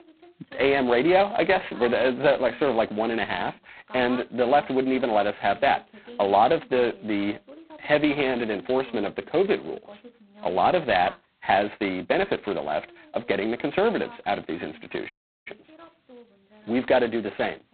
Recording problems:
phone-call audio; poor line; nothing above 4 kHz
voice in the background; faint; throughout; 20 dB below the speech
audio cutting out; at 15 s

